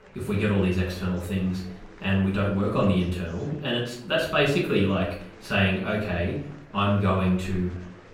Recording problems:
off-mic speech; far
room echo; noticeable; dies away in 0.5 s
murmuring crowd; faint; throughout; 20 dB below the speech

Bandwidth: 16 kHz